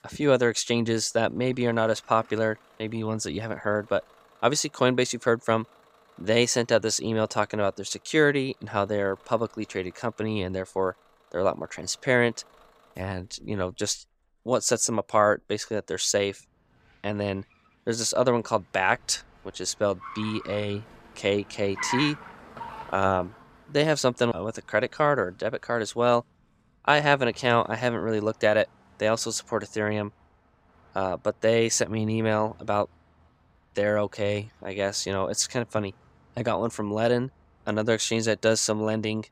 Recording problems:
traffic noise; noticeable; throughout; 15 dB below the speech

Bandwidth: 15.5 kHz